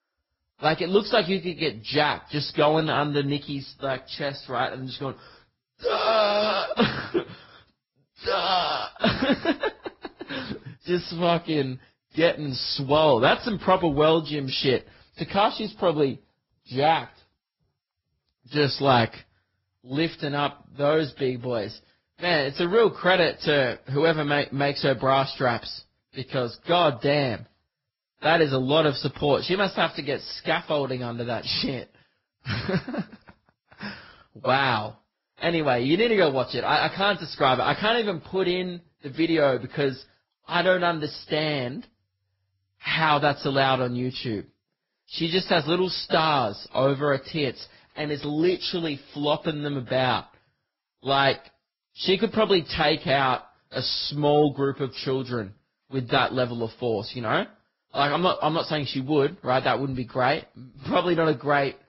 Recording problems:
garbled, watery; badly; nothing above 5.5 kHz

